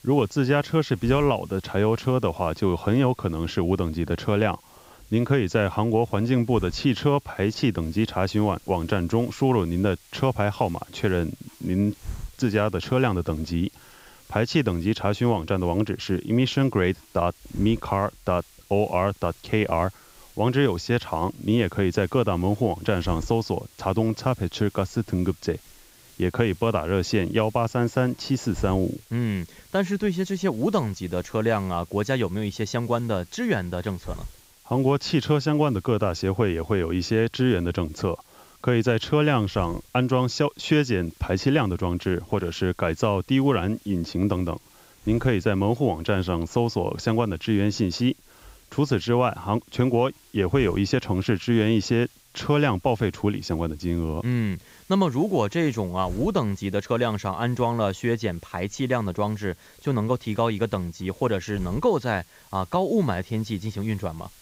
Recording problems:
high frequencies cut off; noticeable; nothing above 8 kHz
hiss; faint; throughout; 25 dB below the speech

